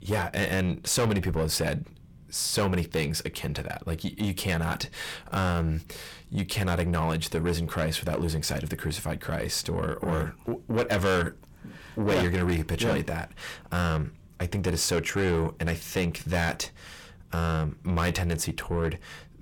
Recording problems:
distortion; heavy; 7 dB below the speech

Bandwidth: 18 kHz